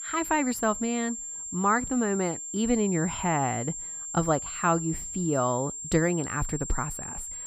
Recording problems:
high-pitched whine; loud; throughout; 7.5 kHz, 6 dB below the speech

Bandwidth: 15.5 kHz